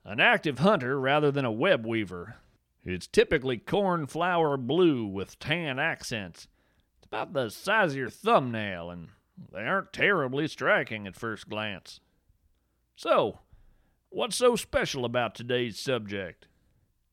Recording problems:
none

